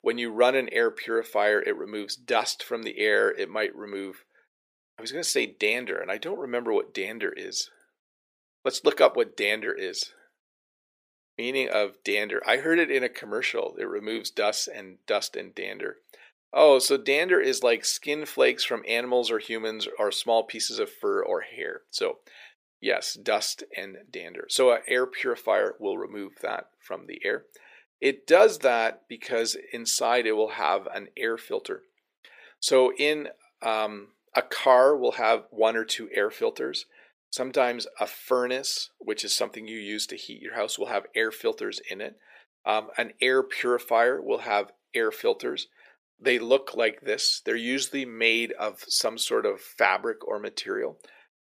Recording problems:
thin; somewhat; fading below 400 Hz

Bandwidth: 15 kHz